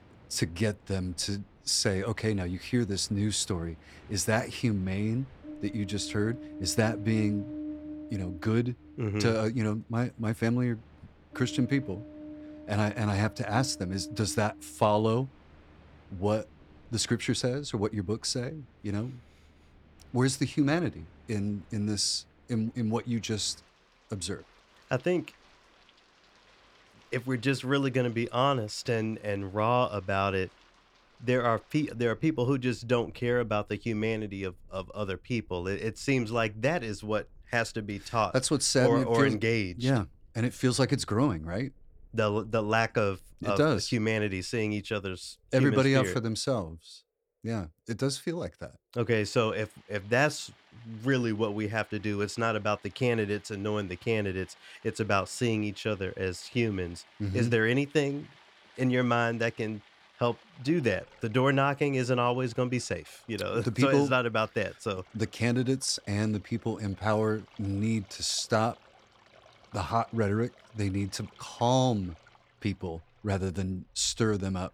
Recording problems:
rain or running water; faint; throughout; 20 dB below the speech

